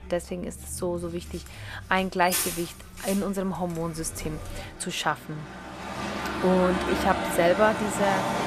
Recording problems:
traffic noise; loud; throughout; 4 dB below the speech

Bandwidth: 14.5 kHz